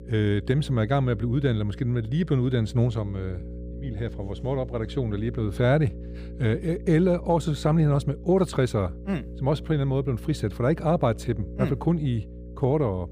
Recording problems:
electrical hum; noticeable; throughout; 60 Hz, 20 dB below the speech

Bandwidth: 15 kHz